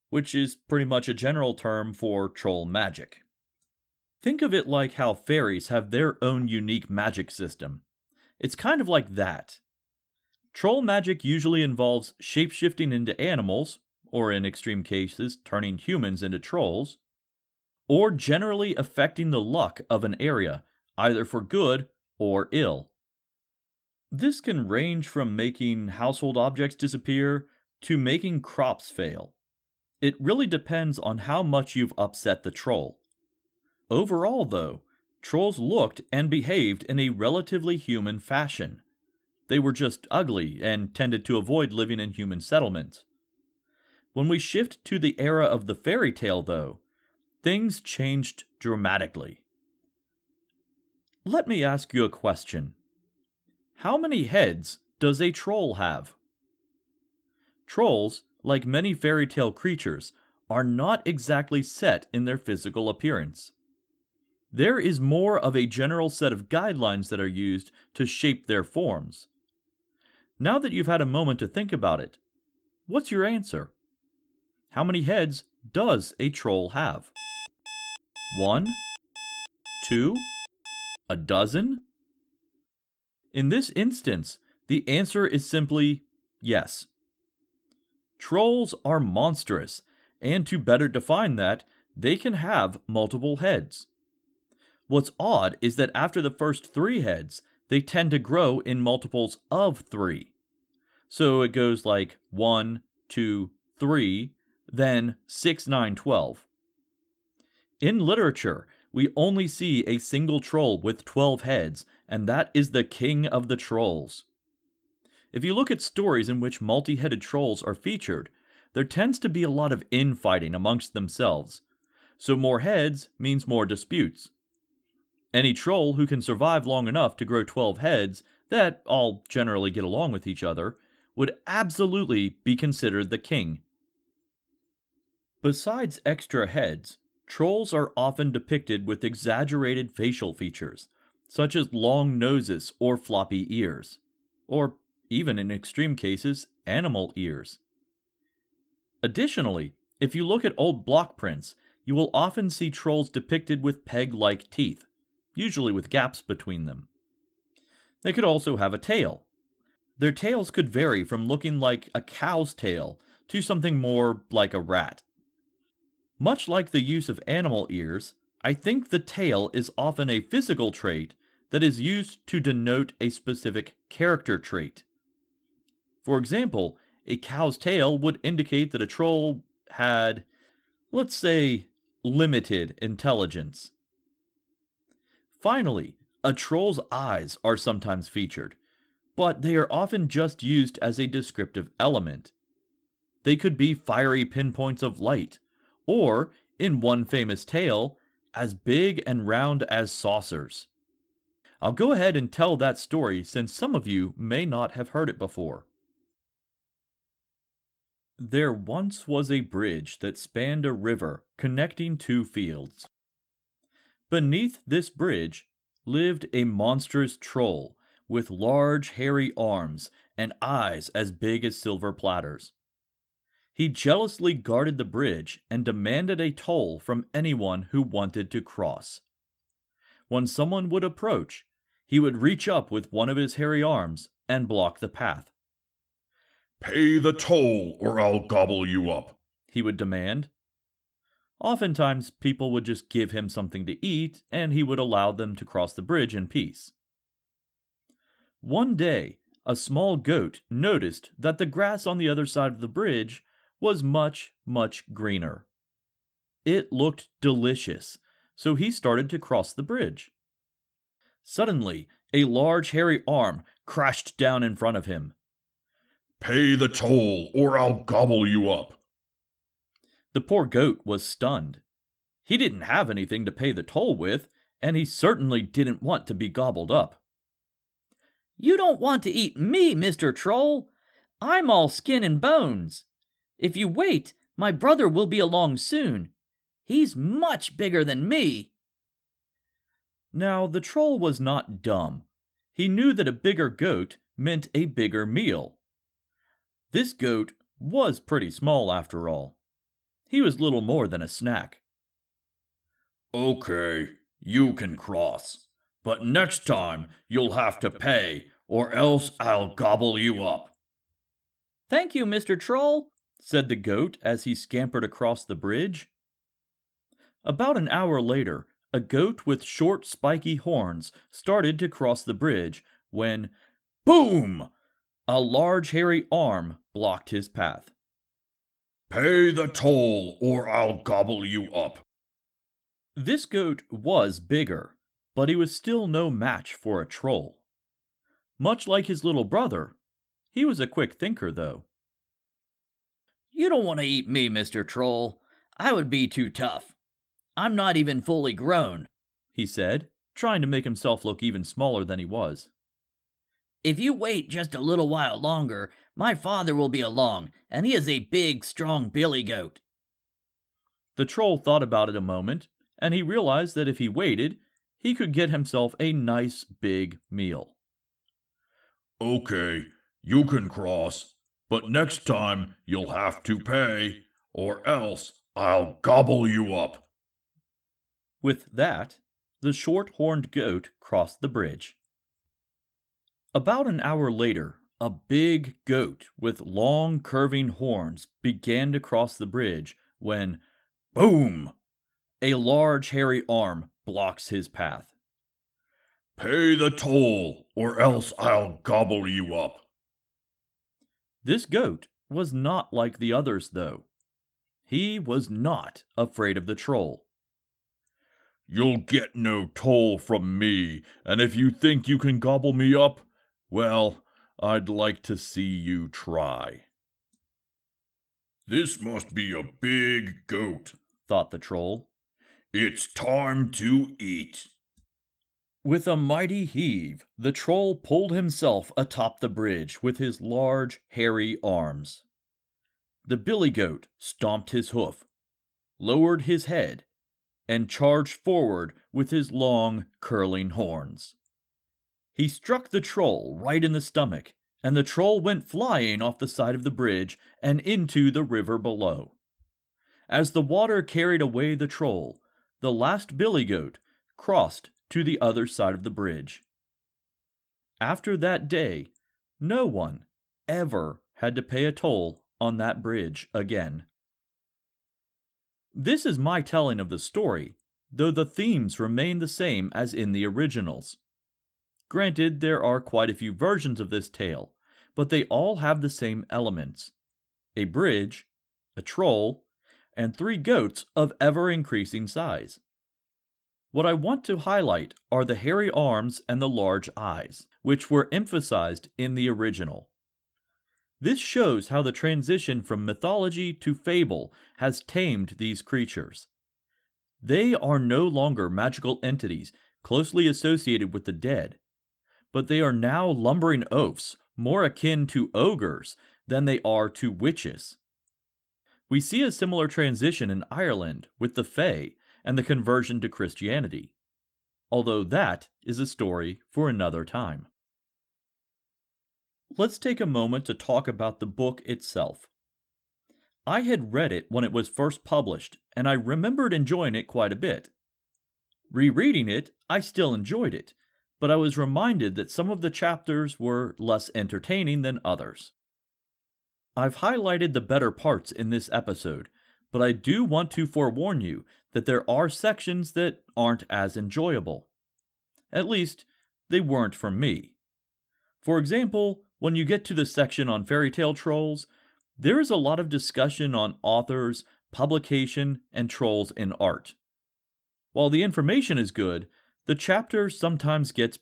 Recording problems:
garbled, watery; slightly
alarm; faint; from 1:17 to 1:21; peak 10 dB below the speech

